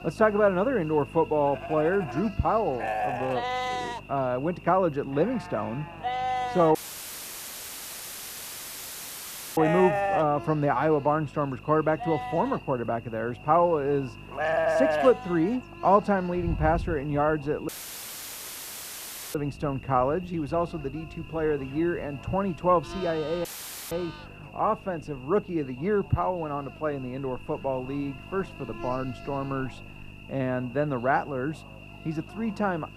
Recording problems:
muffled; very; fading above 1.5 kHz
animal sounds; loud; throughout; 4 dB below the speech
electrical hum; noticeable; throughout; 50 Hz, 20 dB below the speech
voice in the background; faint; throughout; 30 dB below the speech
audio cutting out; filled with static; at 7 s for 3 s, at 18 s for 1.5 s and at 23 s

